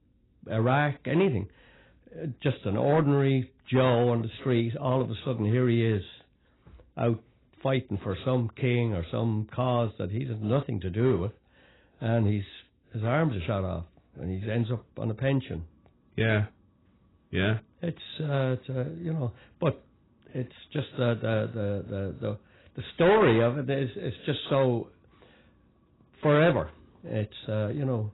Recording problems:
garbled, watery; badly; nothing above 4 kHz
distortion; slight; 3% of the sound clipped

